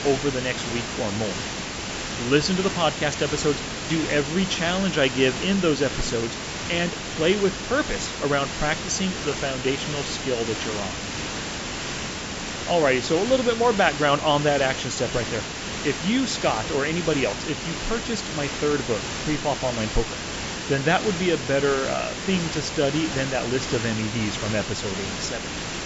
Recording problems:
high frequencies cut off; noticeable; nothing above 8 kHz
hiss; loud; throughout; 5 dB below the speech

